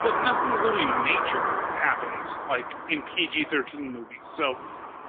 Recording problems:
phone-call audio; poor line; nothing above 3.5 kHz
traffic noise; loud; throughout; as loud as the speech

